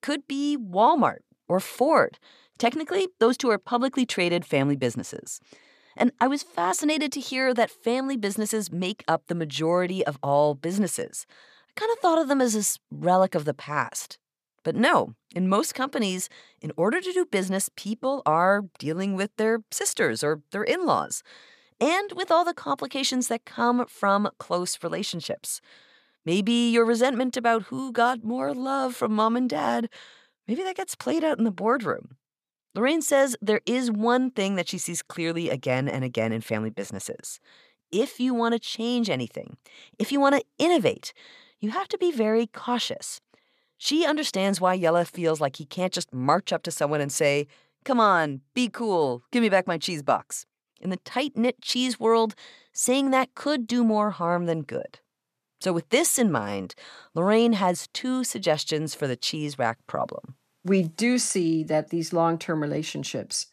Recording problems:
none

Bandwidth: 14.5 kHz